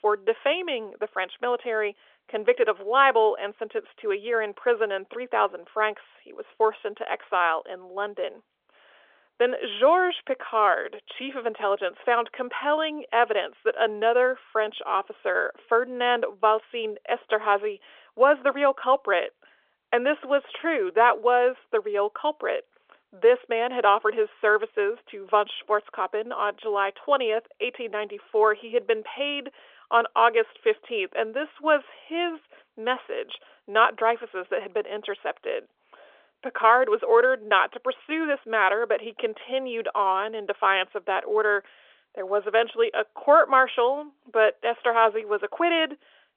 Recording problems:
phone-call audio; nothing above 3.5 kHz

